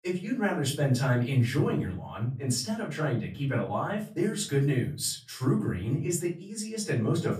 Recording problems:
off-mic speech; far
room echo; slight; dies away in 0.5 s

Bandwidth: 15 kHz